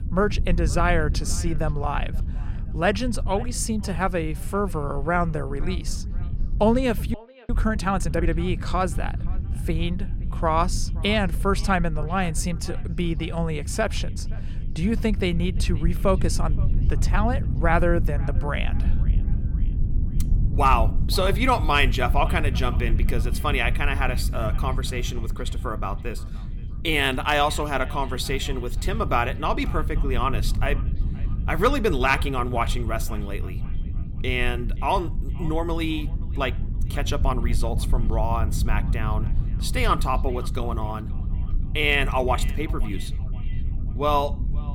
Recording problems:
echo of what is said; faint; throughout; 520 ms later, 25 dB below the speech
low rumble; noticeable; throughout; 20 dB below the speech
audio freezing; at 7 s

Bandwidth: 17.5 kHz